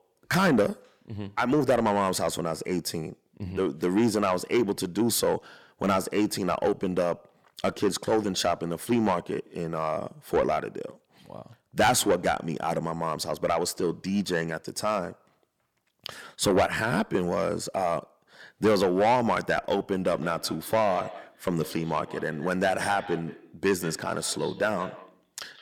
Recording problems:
distortion; heavy; 8 dB below the speech
echo of what is said; noticeable; from 20 s on; 170 ms later, 15 dB below the speech

